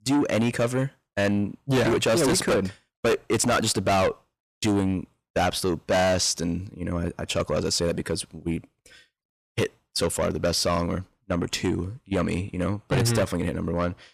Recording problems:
distortion; heavy; 6 dB below the speech

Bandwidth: 14.5 kHz